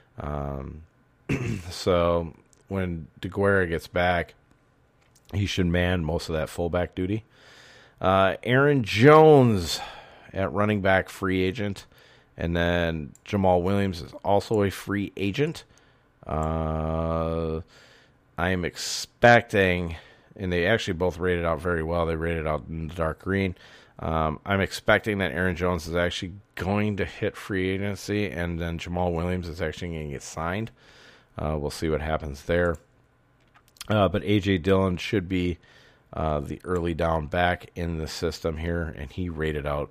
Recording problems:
none

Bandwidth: 15 kHz